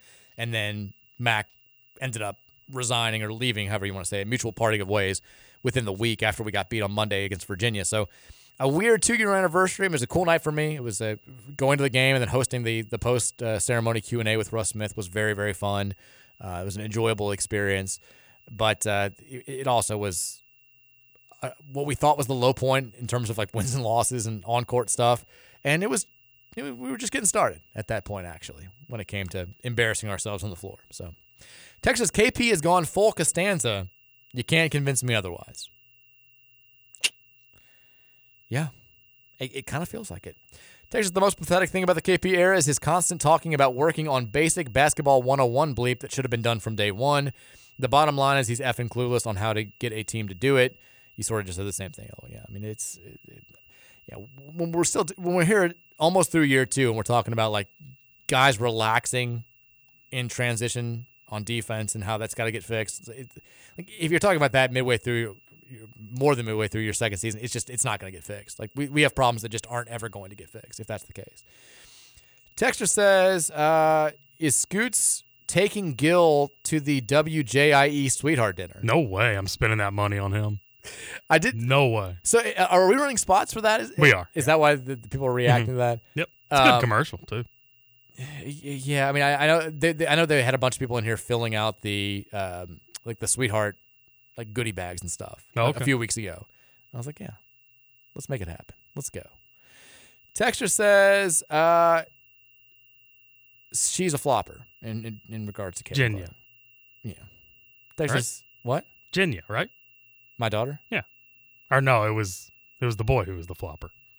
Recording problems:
high-pitched whine; faint; throughout; 3 kHz, 35 dB below the speech

